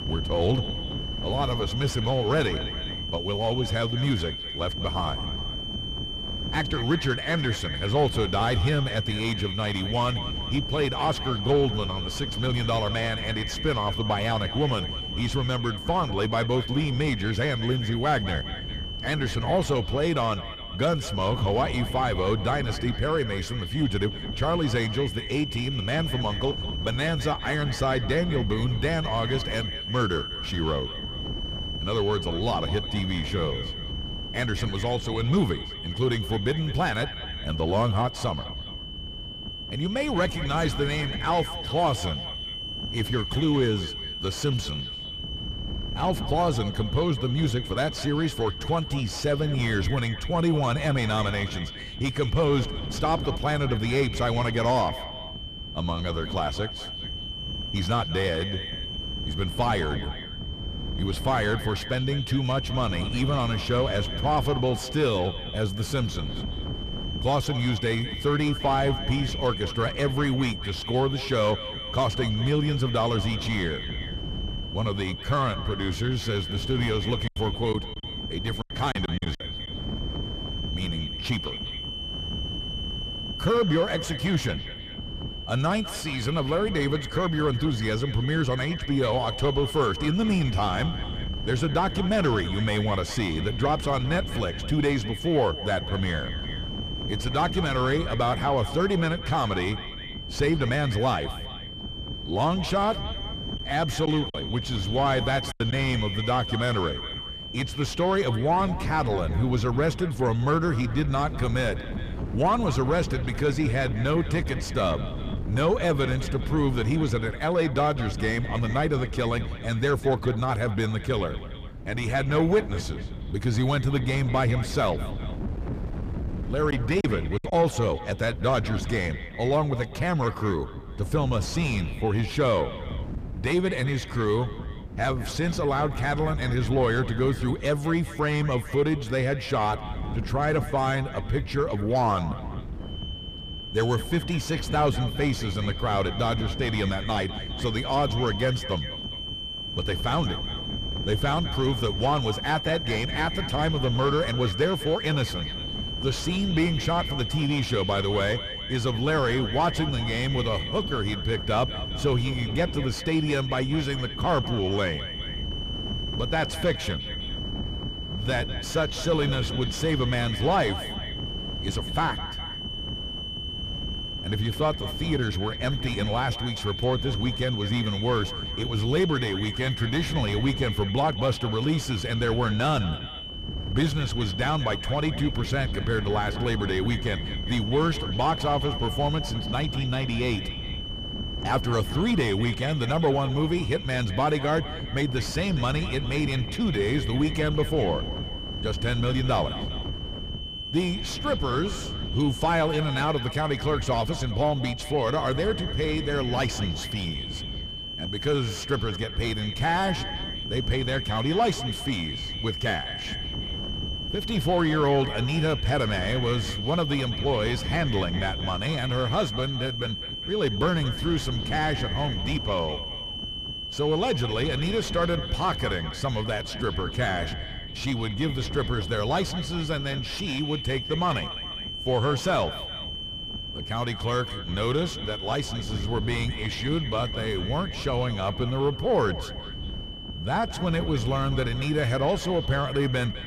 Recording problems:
echo of what is said; noticeable; throughout; 210 ms later, 15 dB below the speech
distortion; slight; 10 dB below the speech
high-pitched whine; loud; until 1:48 and from 2:23 on; 3 kHz, 8 dB below the speech
wind noise on the microphone; occasional gusts; 15 dB below the speech
choppy; very; from 1:17 to 1:19, from 1:44 to 1:46 and at 2:07; 11% of the speech affected

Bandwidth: 15 kHz